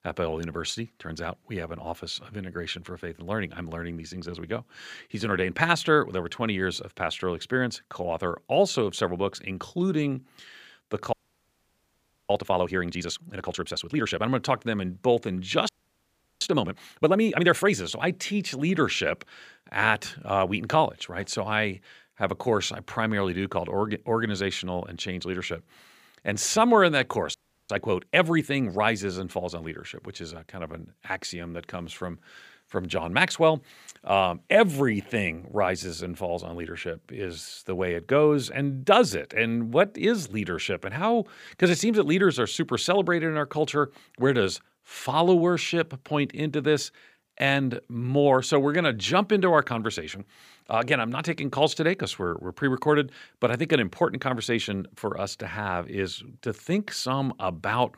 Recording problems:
audio freezing; at 11 s for 1 s, at 16 s for 0.5 s and at 27 s

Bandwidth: 15 kHz